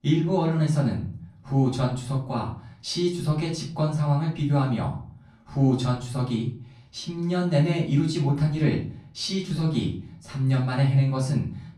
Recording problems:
off-mic speech; far
room echo; slight; dies away in 0.5 s

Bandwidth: 15.5 kHz